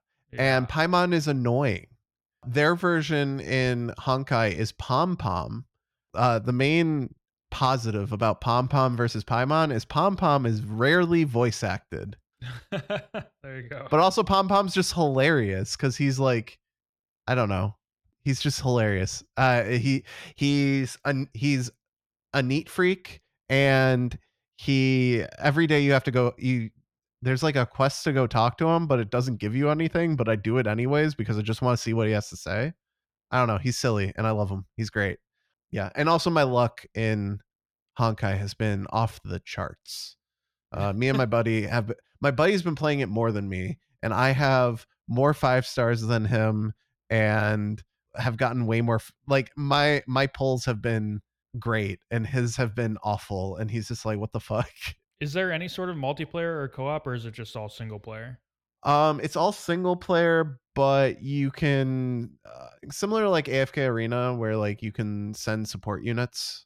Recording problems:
none

